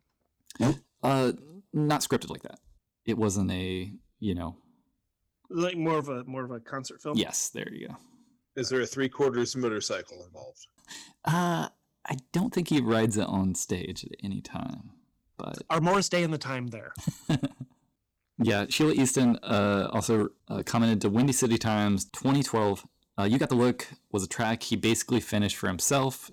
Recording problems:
distortion; slight; 4% of the sound clipped
uneven, jittery; strongly; from 0.5 to 25 s

